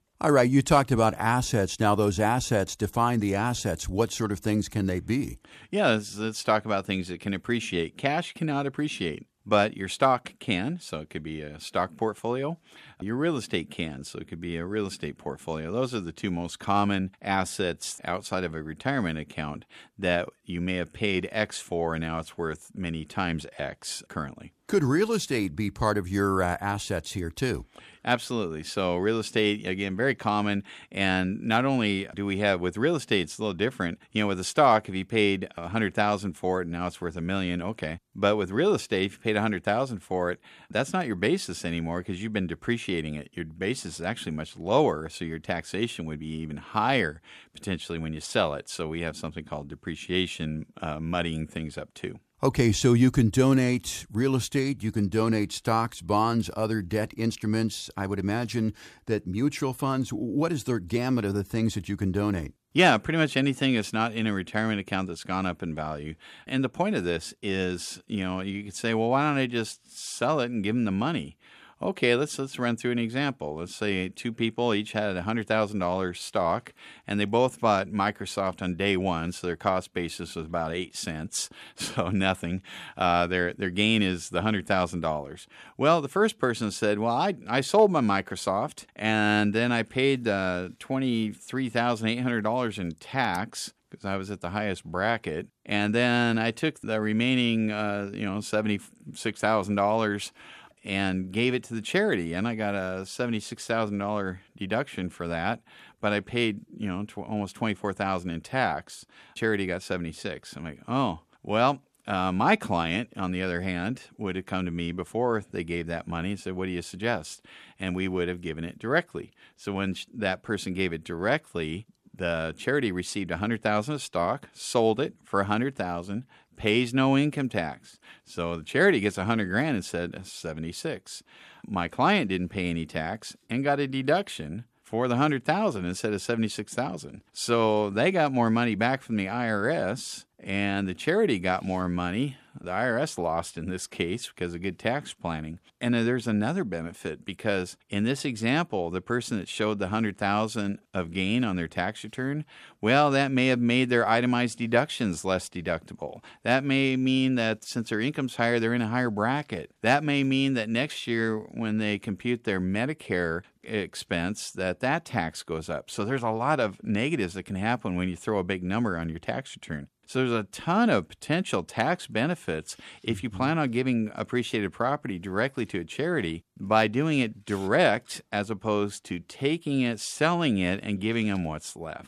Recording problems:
none

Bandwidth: 14.5 kHz